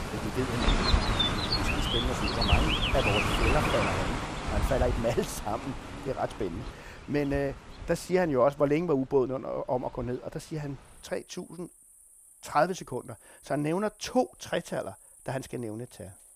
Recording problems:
animal sounds; very loud; throughout; 2 dB above the speech

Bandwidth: 15 kHz